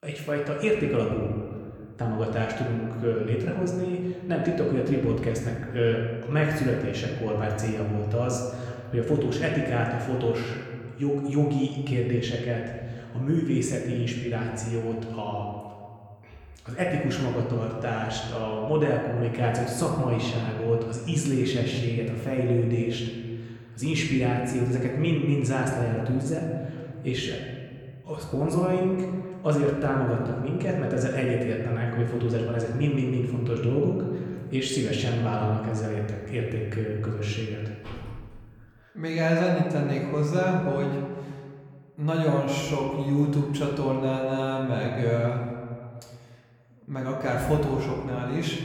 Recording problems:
room echo; noticeable; dies away in 1.8 s
off-mic speech; somewhat distant
door banging; faint; at 38 s; peak 15 dB below the speech

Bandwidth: 18.5 kHz